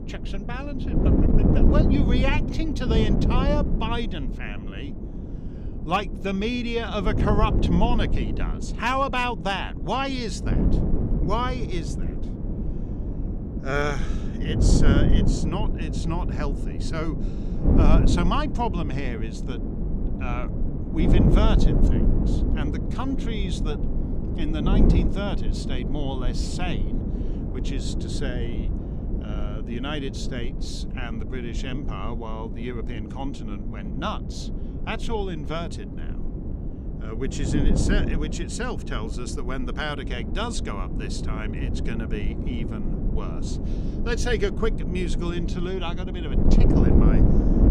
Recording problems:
wind noise on the microphone; heavy; 4 dB below the speech

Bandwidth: 16.5 kHz